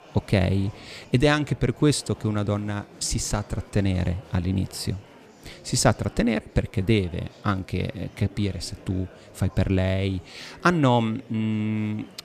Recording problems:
murmuring crowd; faint; throughout; 20 dB below the speech

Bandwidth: 14.5 kHz